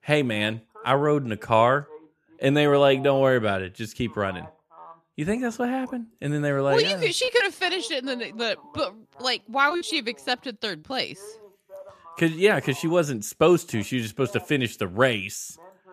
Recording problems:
voice in the background; faint; throughout; 25 dB below the speech

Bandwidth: 14.5 kHz